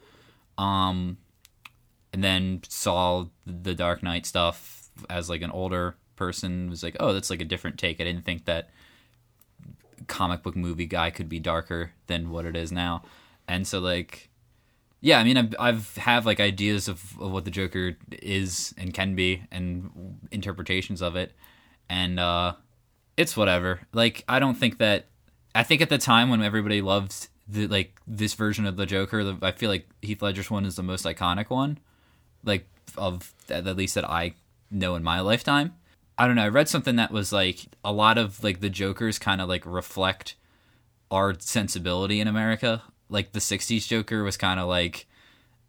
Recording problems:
none

